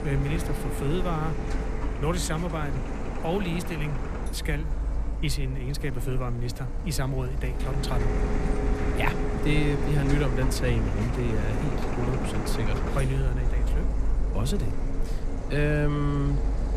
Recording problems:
household noises; loud; throughout; 1 dB below the speech

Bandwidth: 14.5 kHz